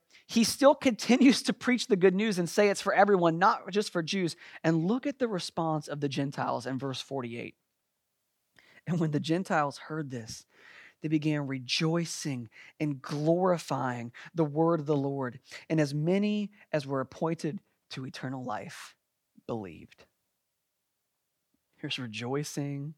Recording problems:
none

